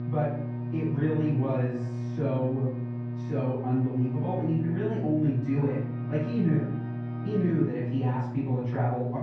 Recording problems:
off-mic speech; far
muffled; very; fading above 1.5 kHz
room echo; noticeable; dies away in 0.6 s
electrical hum; loud; throughout; 60 Hz, 9 dB below the speech
background music; noticeable; throughout; 20 dB below the speech

